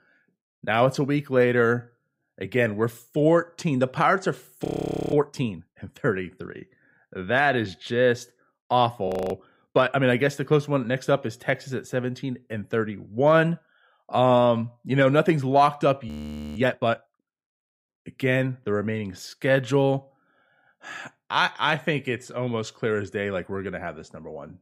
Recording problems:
audio freezing; at 4.5 s, at 9 s and at 16 s

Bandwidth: 15.5 kHz